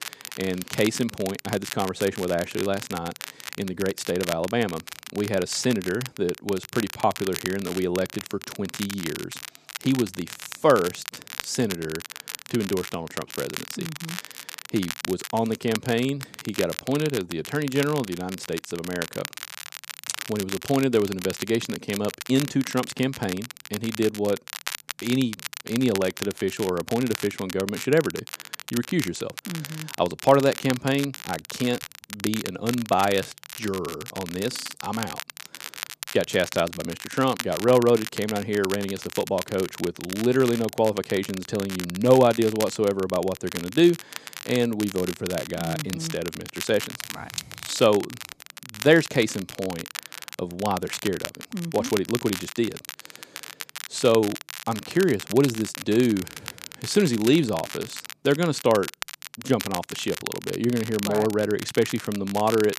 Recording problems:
crackle, like an old record; noticeable; 10 dB below the speech

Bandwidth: 14.5 kHz